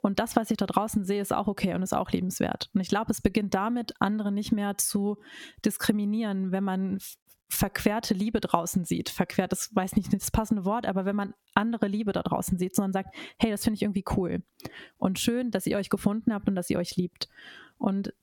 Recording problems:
squashed, flat; somewhat

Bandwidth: 17.5 kHz